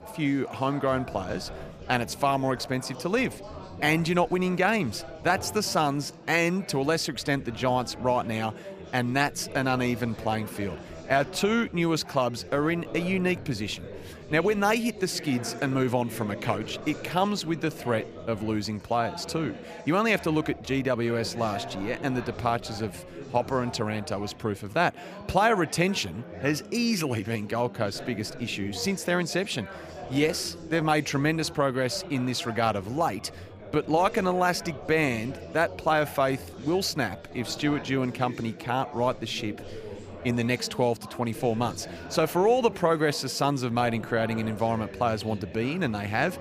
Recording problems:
chatter from many people; noticeable; throughout; 15 dB below the speech

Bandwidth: 14.5 kHz